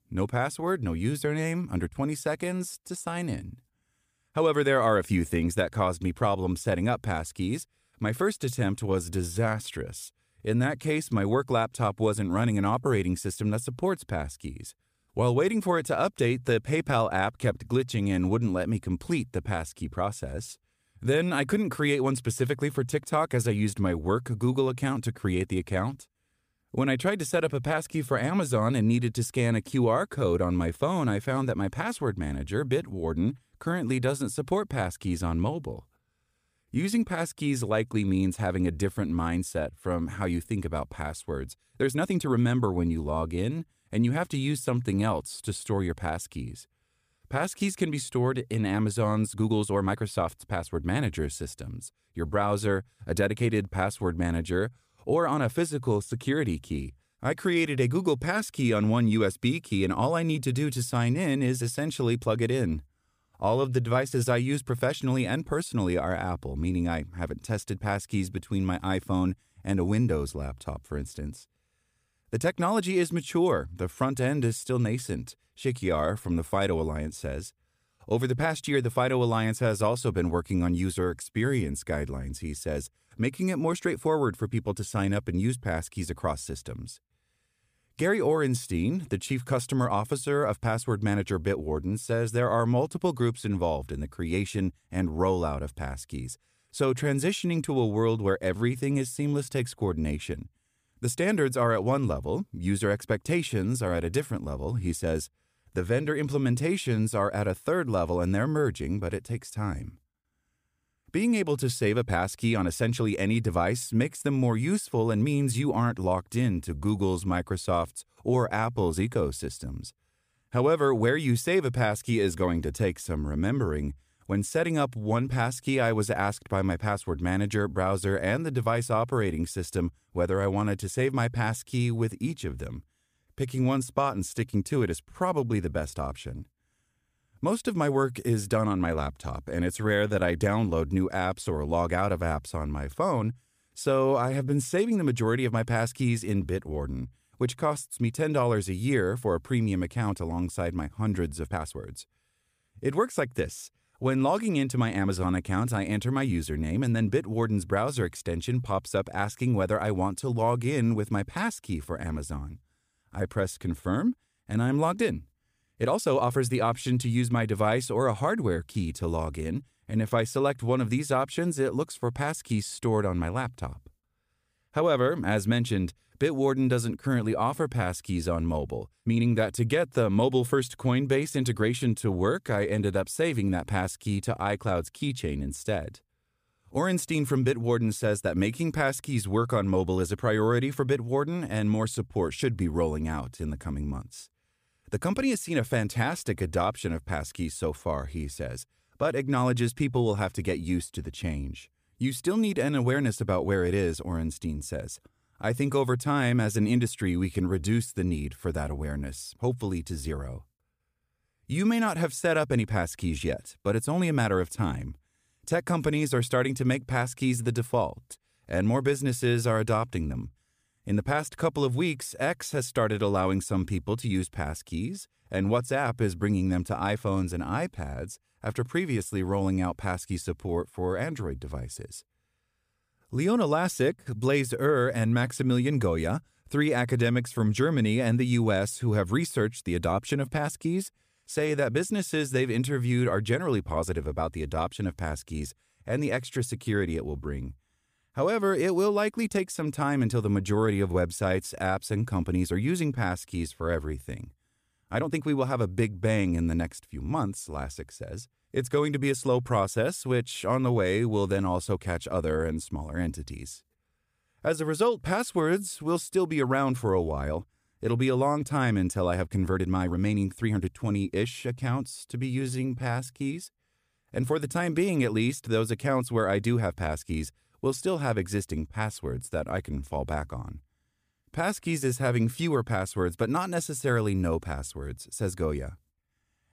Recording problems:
uneven, jittery; strongly; from 3 s to 4:34

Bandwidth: 15 kHz